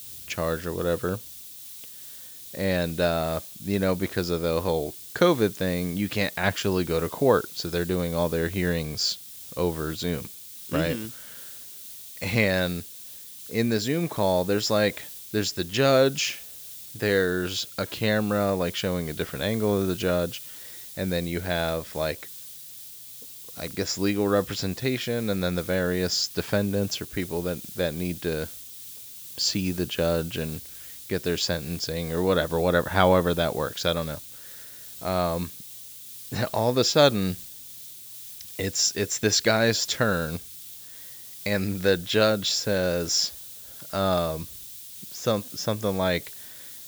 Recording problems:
high frequencies cut off; noticeable; nothing above 8 kHz
hiss; noticeable; throughout; 15 dB below the speech

